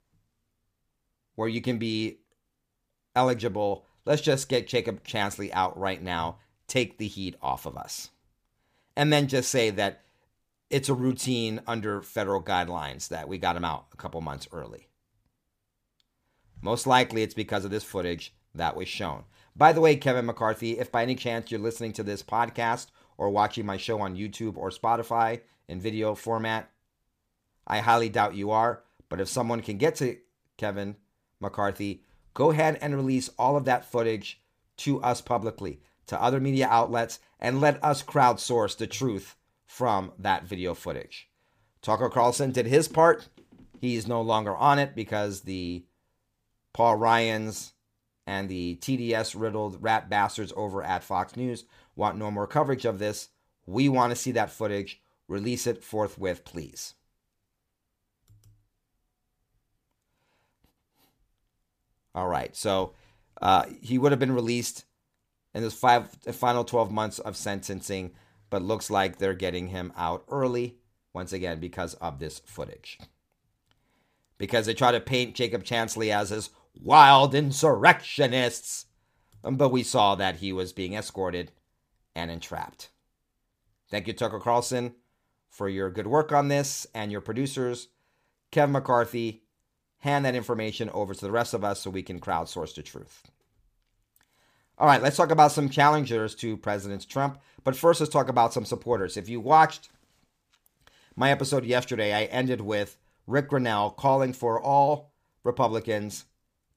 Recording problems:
none

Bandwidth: 15 kHz